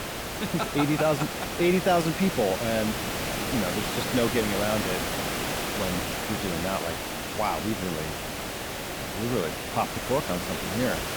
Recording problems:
hiss; loud; throughout; 2 dB below the speech

